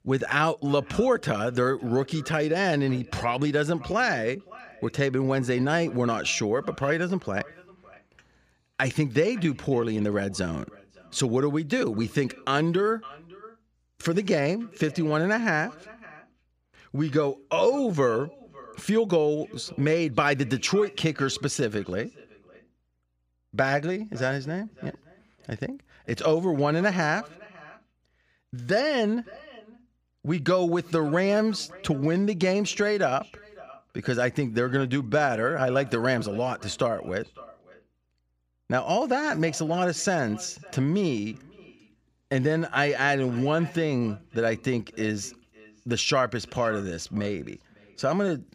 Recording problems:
echo of what is said; faint; throughout; 560 ms later, 25 dB below the speech

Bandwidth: 15 kHz